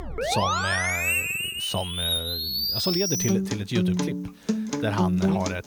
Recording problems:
background music; very loud; throughout; 5 dB above the speech

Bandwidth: 18.5 kHz